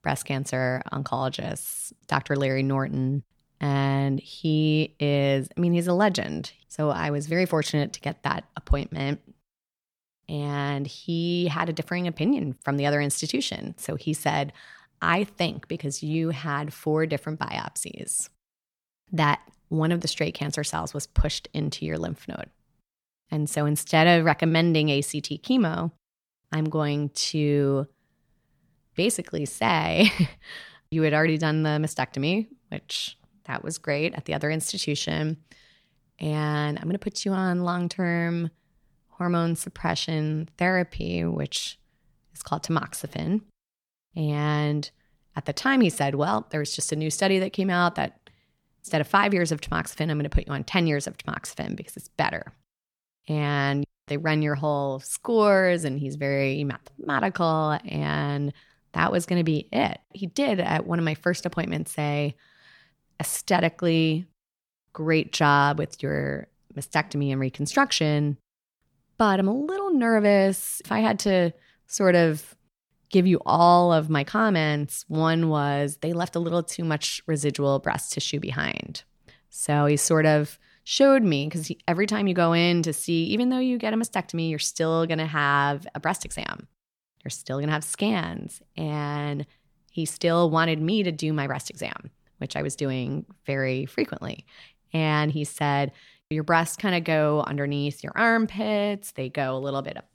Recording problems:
none

